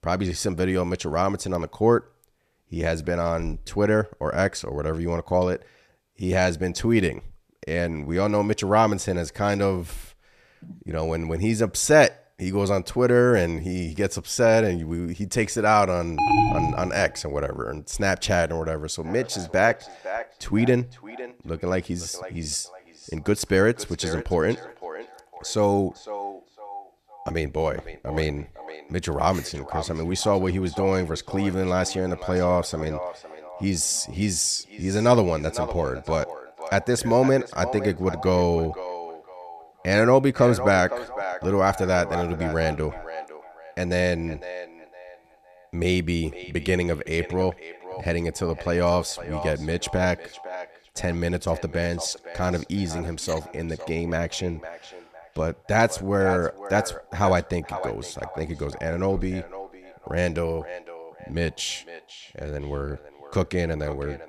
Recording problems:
echo of what is said; noticeable; from 19 s on; 510 ms later, 15 dB below the speech
alarm; loud; at 16 s; peak 4 dB above the speech

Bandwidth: 14.5 kHz